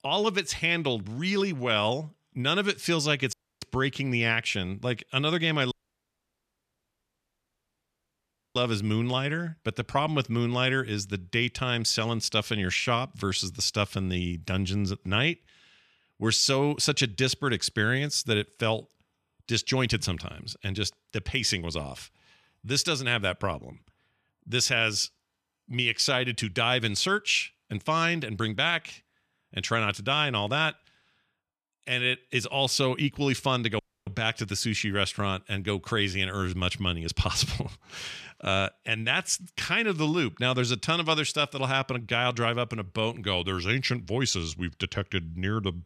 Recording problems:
audio cutting out; at 3.5 s, at 5.5 s for 3 s and at 34 s

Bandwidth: 14 kHz